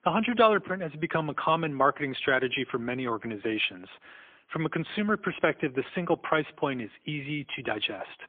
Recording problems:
phone-call audio; poor line; nothing above 3.5 kHz

